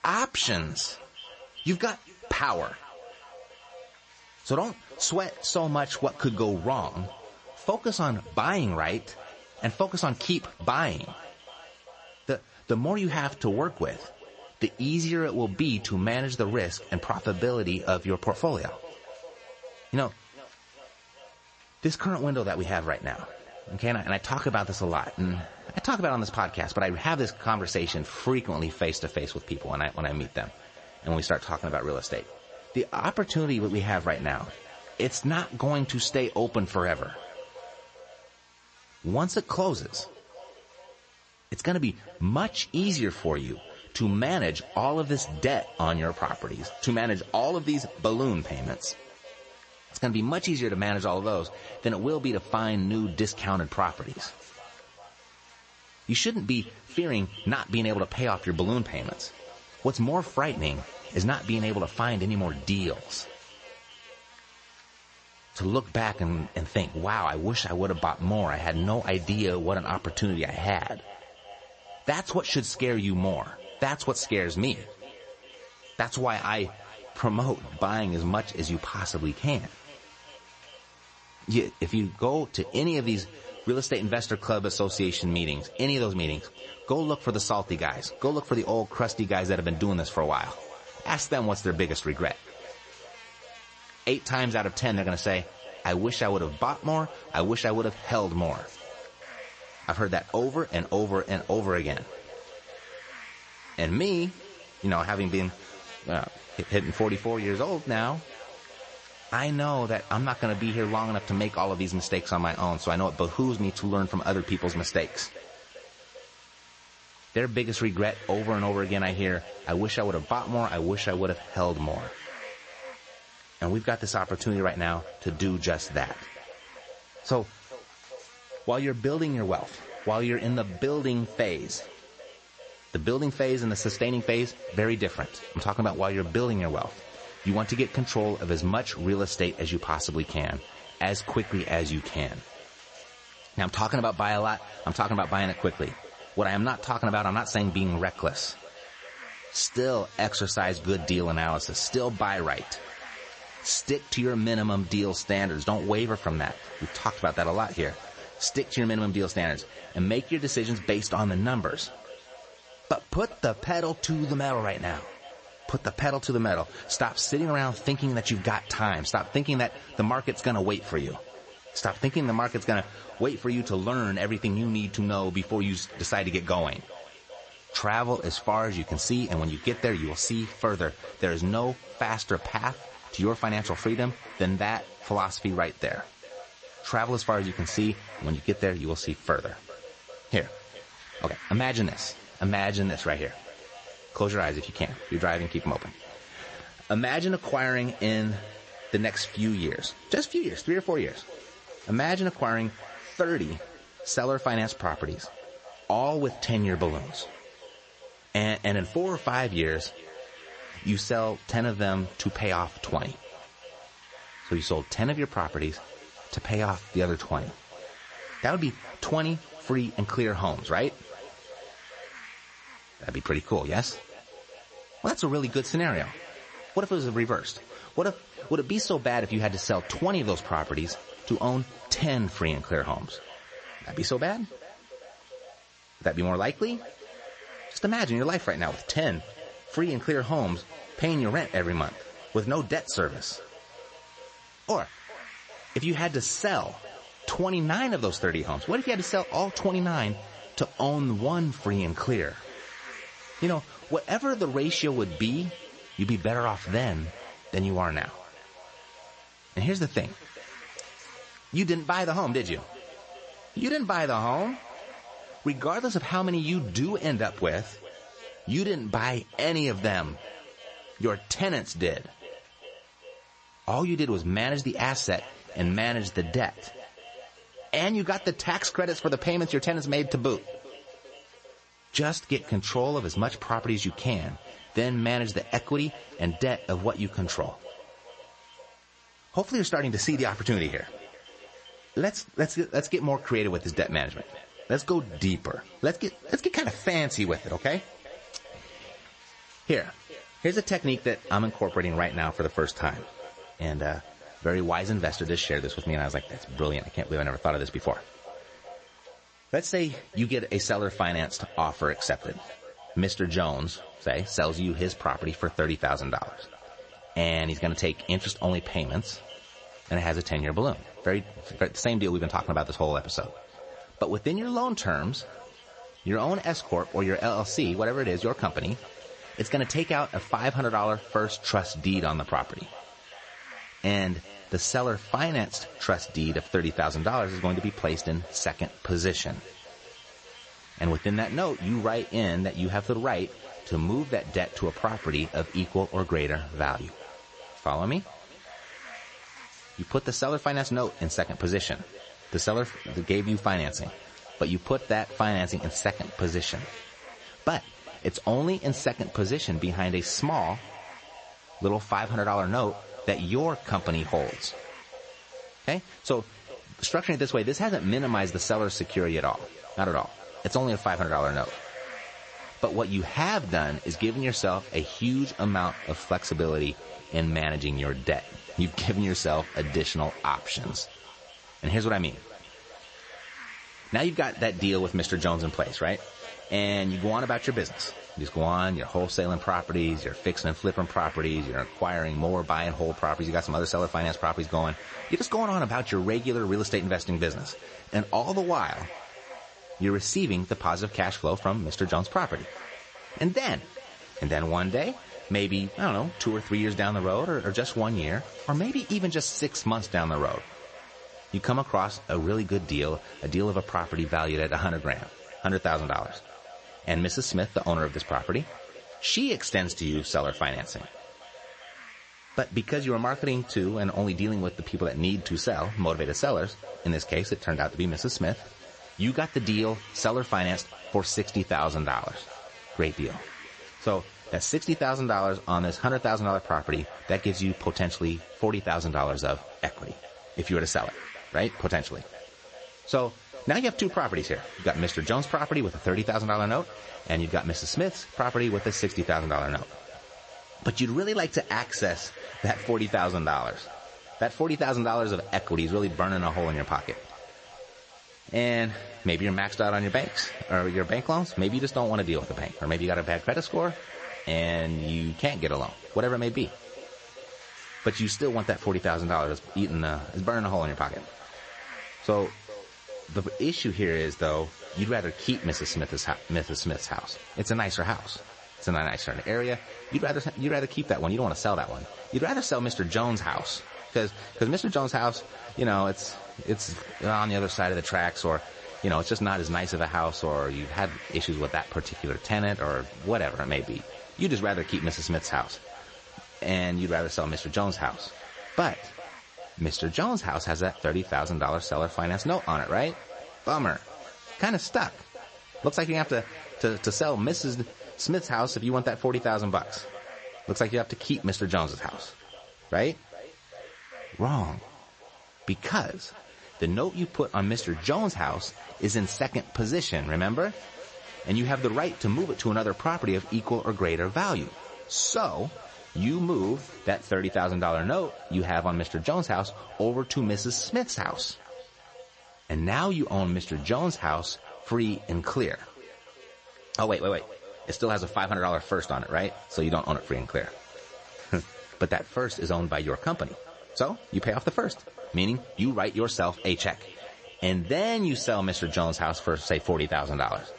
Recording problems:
echo of what is said; faint; throughout; 400 ms later, 20 dB below the speech
garbled, watery; slightly; nothing above 8 kHz
high frequencies cut off; slight
electrical hum; faint; throughout; 60 Hz, 20 dB below the speech
hiss; faint; from 1:39 to 4:28 and from 5:26 to 8:43; 20 dB below the speech

